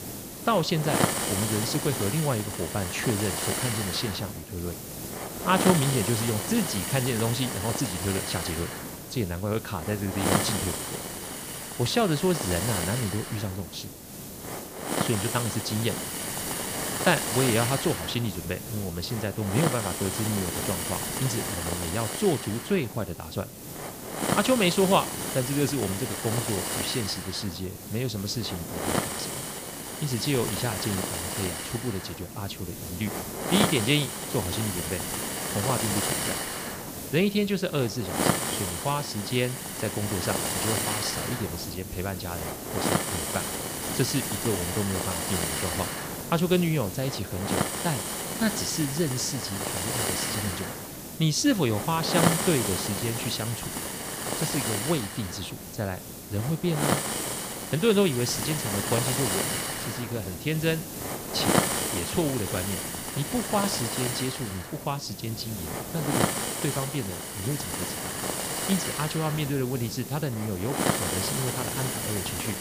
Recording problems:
hiss; loud; throughout; 1 dB below the speech

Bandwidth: 15 kHz